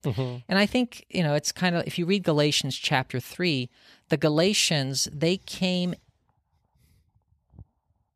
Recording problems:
none

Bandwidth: 14.5 kHz